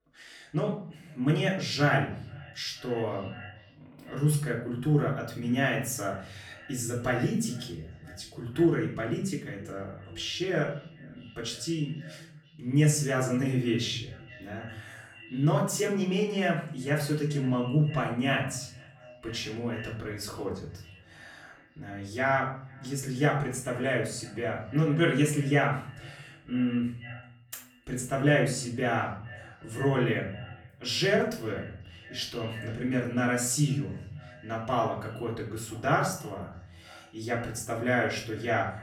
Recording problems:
off-mic speech; far
echo of what is said; faint; throughout; 490 ms later, 20 dB below the speech
room echo; slight; dies away in 0.5 s

